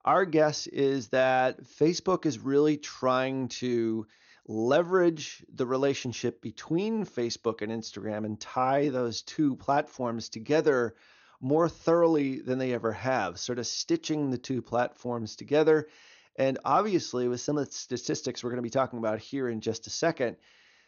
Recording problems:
high frequencies cut off; noticeable; nothing above 6.5 kHz

